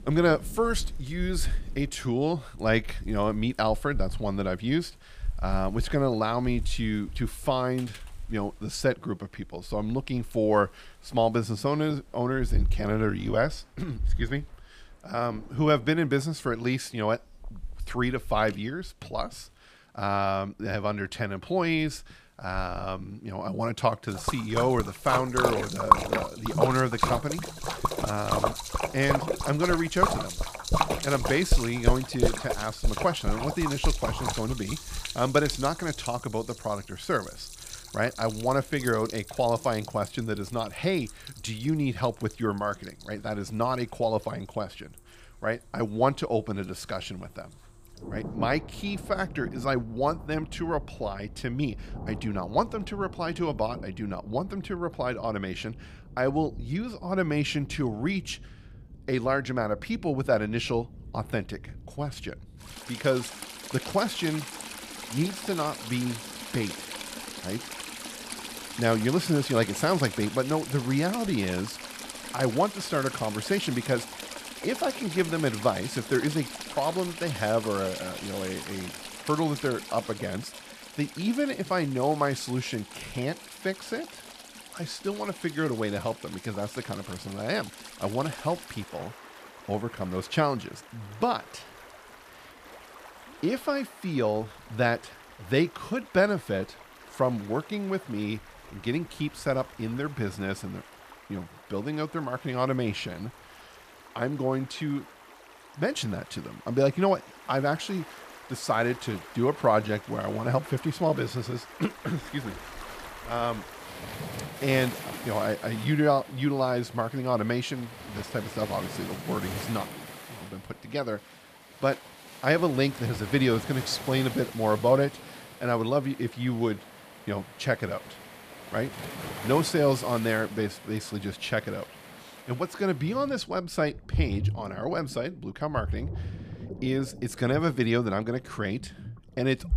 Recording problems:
rain or running water; loud; throughout; 7 dB below the speech

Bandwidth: 15 kHz